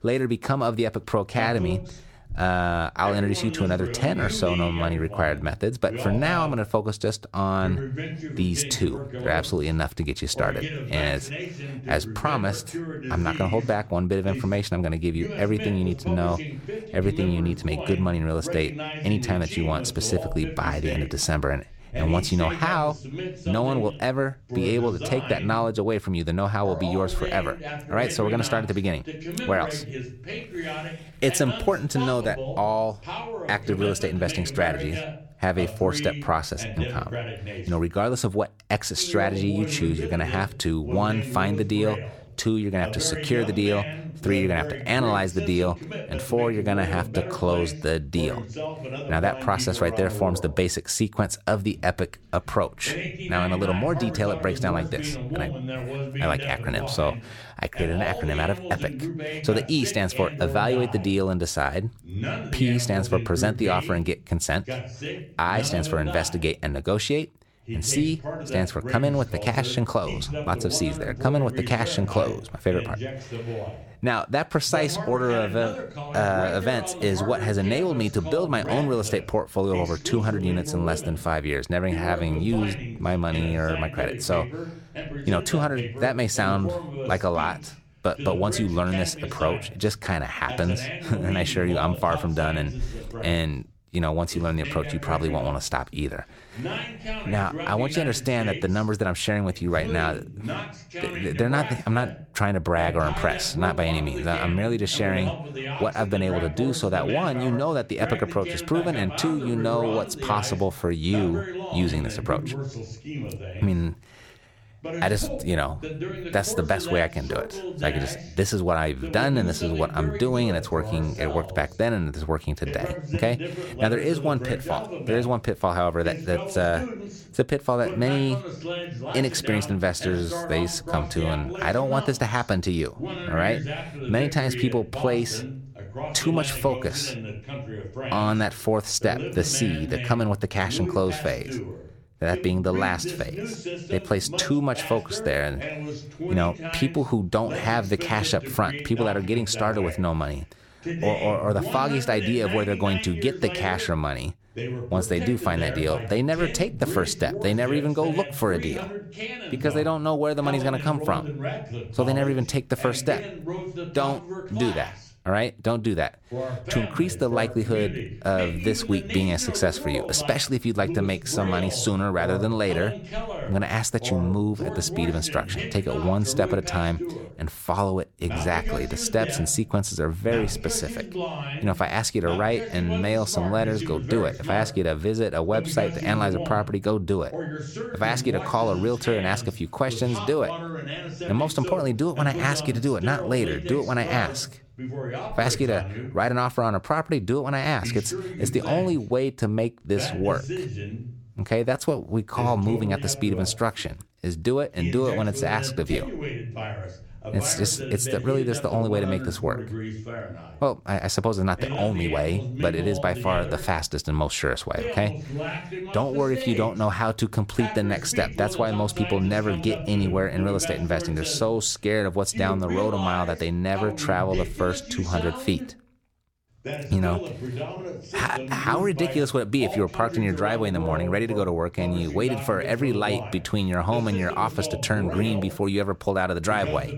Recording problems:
voice in the background; loud; throughout; 8 dB below the speech

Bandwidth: 17.5 kHz